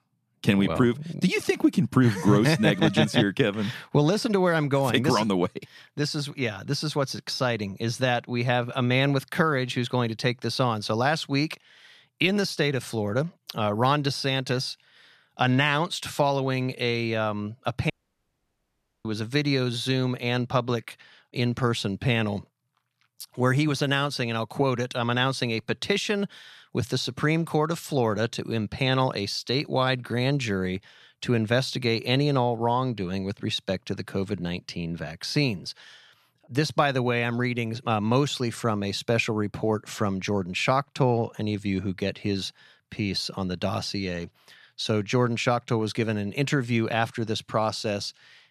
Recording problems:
audio cutting out; at 18 s for 1 s

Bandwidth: 14 kHz